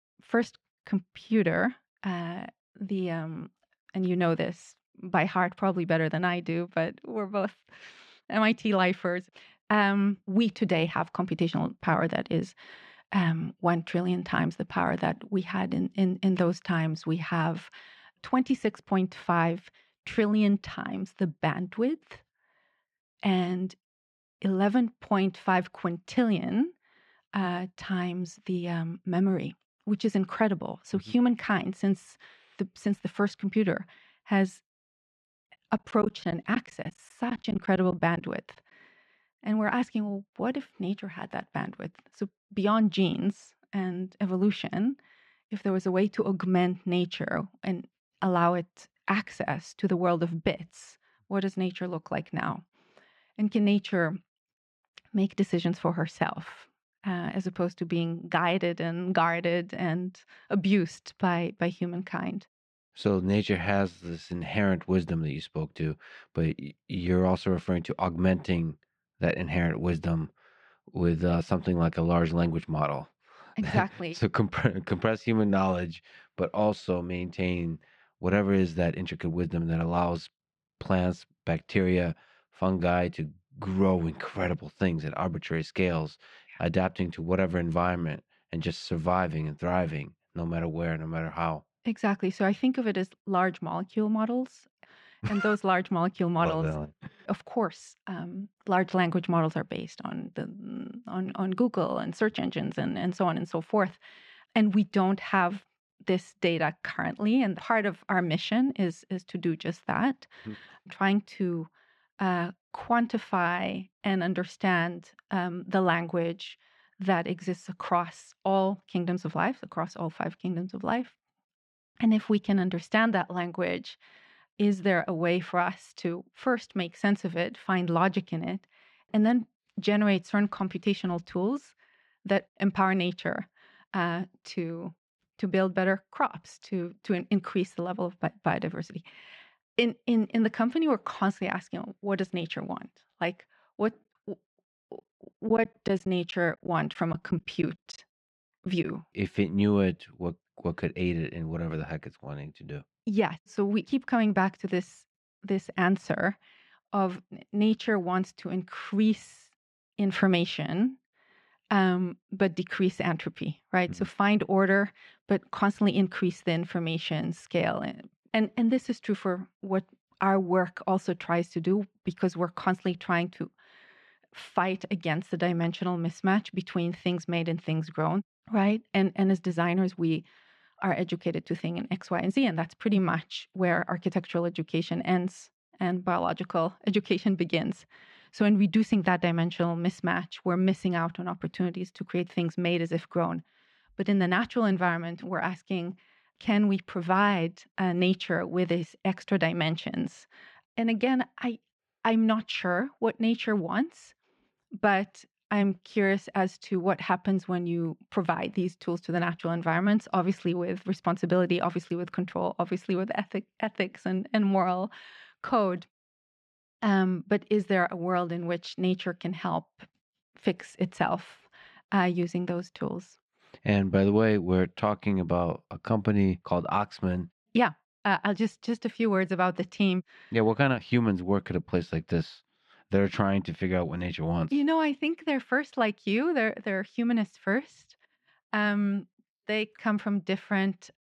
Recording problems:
muffled; slightly; fading above 3 kHz
choppy; very; from 36 to 38 s and from 2:25 to 2:29; 9% of the speech affected

